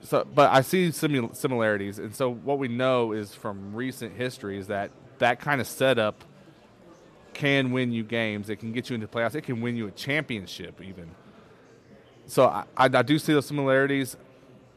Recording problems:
murmuring crowd; faint; throughout; 25 dB below the speech

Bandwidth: 14 kHz